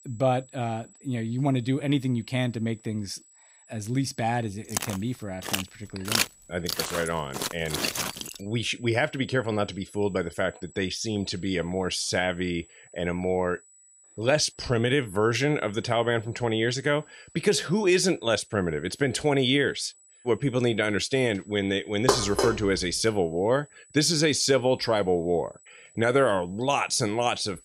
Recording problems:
high-pitched whine; faint; throughout; 8 kHz, 25 dB below the speech
footsteps; loud; from 4.5 to 8.5 s; peak 1 dB above the speech
clattering dishes; loud; at 22 s; peak 1 dB above the speech

